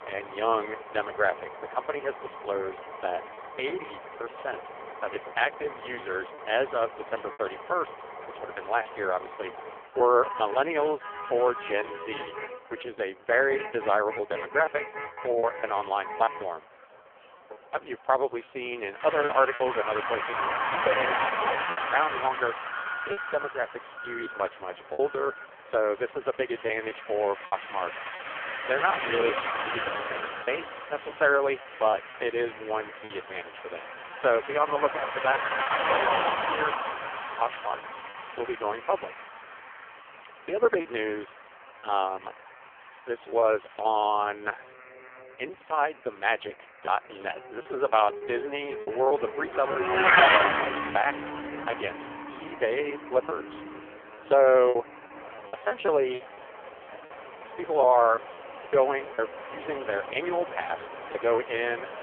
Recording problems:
phone-call audio; poor line; nothing above 3.5 kHz
traffic noise; loud; throughout; 4 dB below the speech
alarms or sirens; faint; from 18 s on; 20 dB below the speech
choppy; occasionally; 4% of the speech affected

